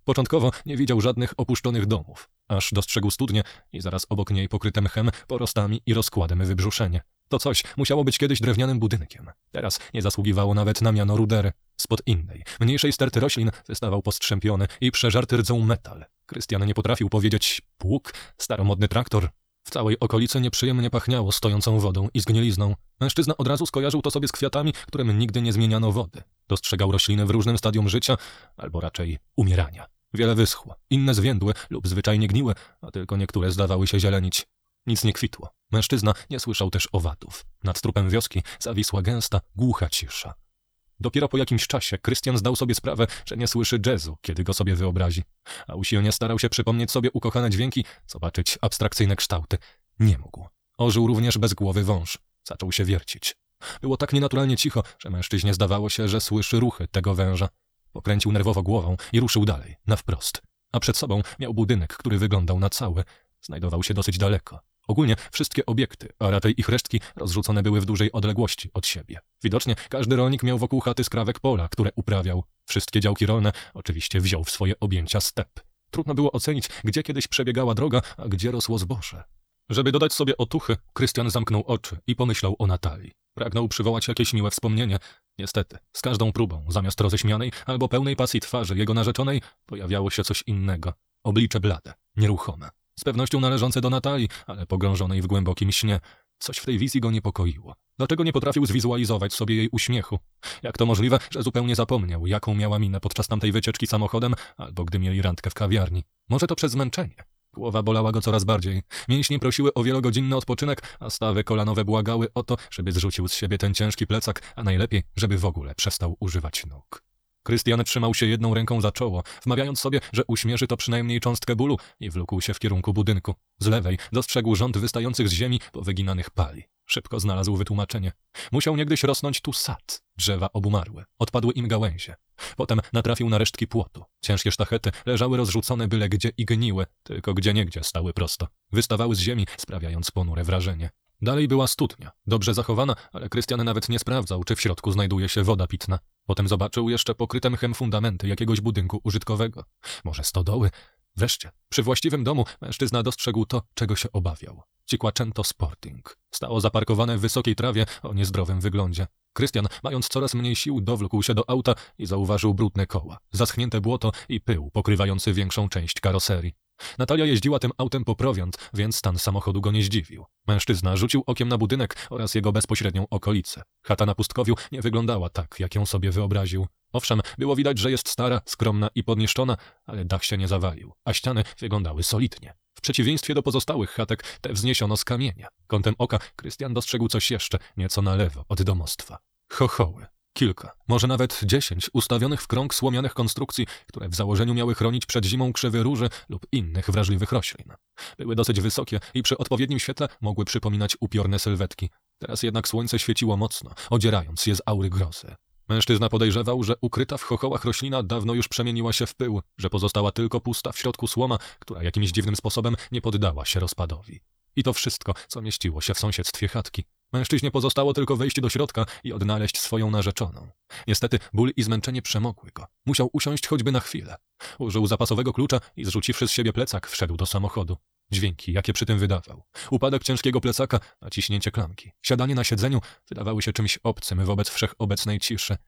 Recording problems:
wrong speed, natural pitch; too fast; 1.6 times normal speed

